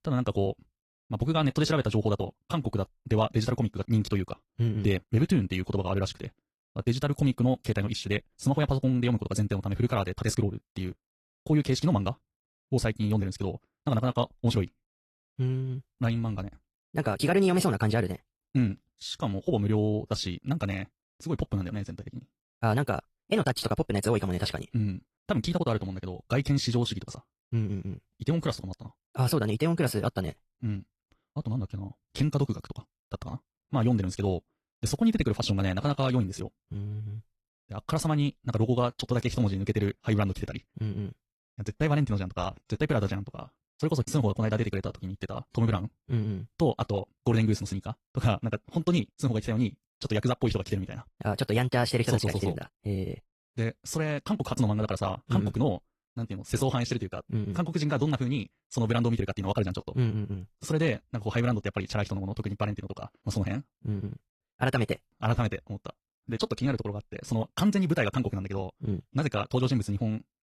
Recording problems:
wrong speed, natural pitch; too fast; 1.7 times normal speed
garbled, watery; slightly

